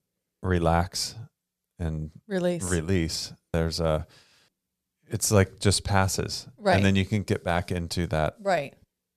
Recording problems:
none

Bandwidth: 14.5 kHz